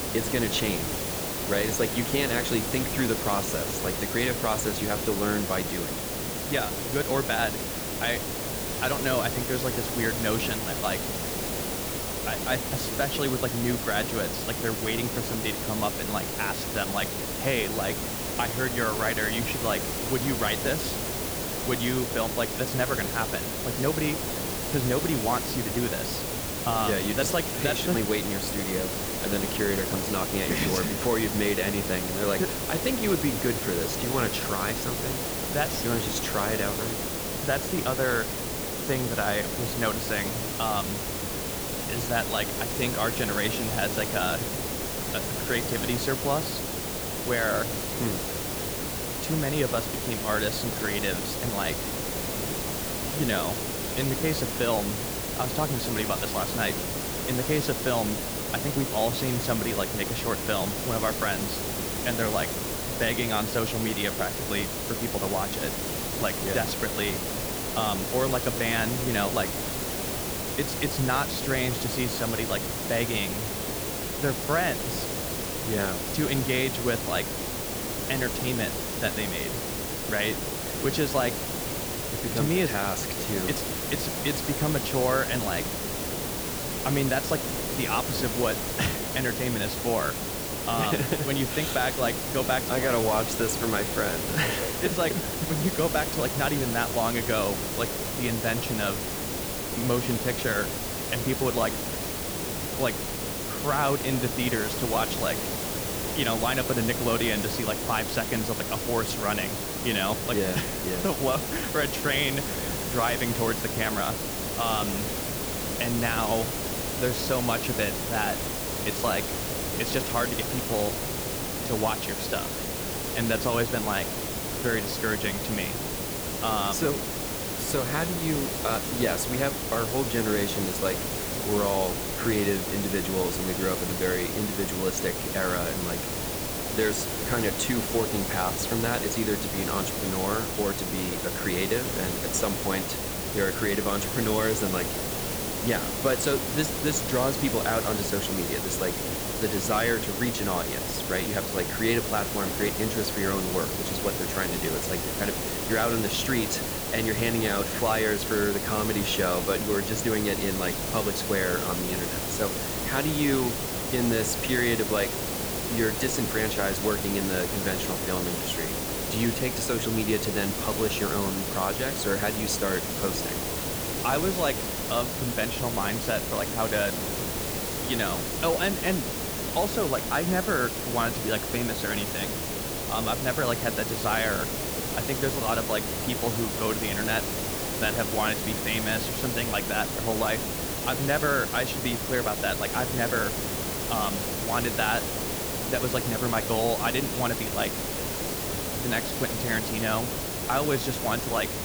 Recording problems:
hiss; loud; throughout; as loud as the speech

